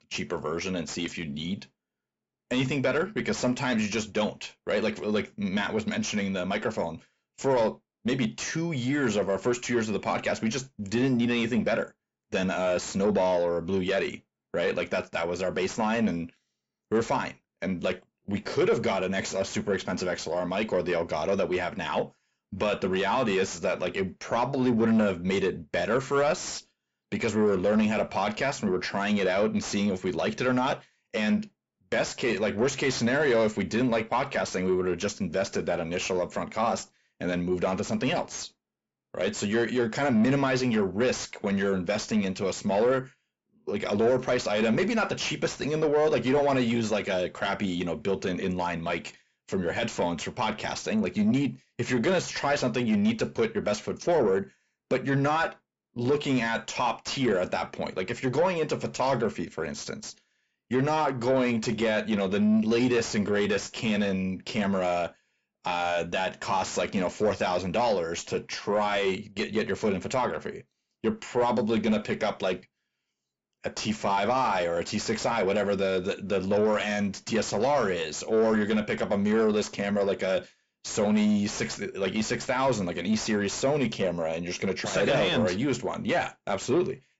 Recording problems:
high frequencies cut off; noticeable; nothing above 8 kHz
distortion; slight; 10 dB below the speech

